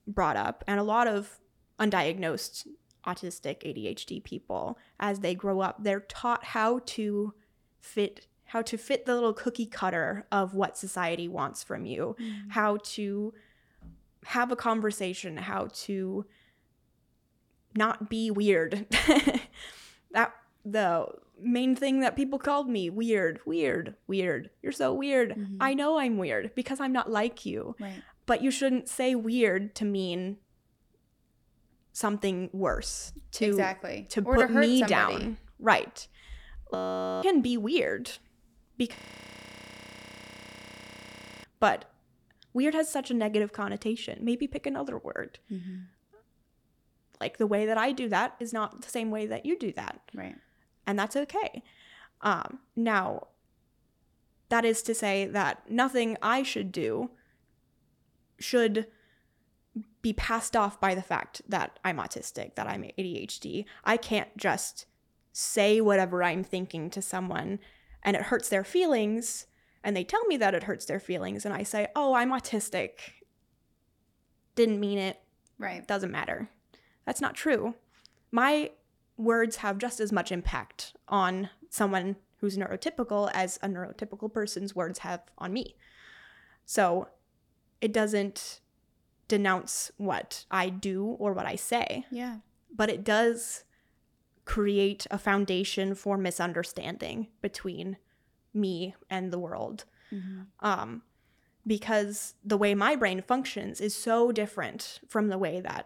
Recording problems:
audio freezing; at 37 s and at 39 s for 2.5 s

